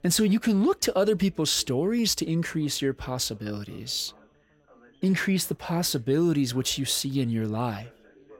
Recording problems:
background chatter; faint; throughout; 3 voices, 30 dB below the speech

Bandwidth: 16.5 kHz